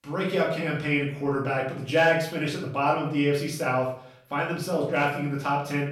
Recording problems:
off-mic speech; far
room echo; noticeable; dies away in 0.5 s

